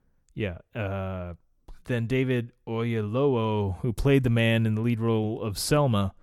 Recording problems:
none

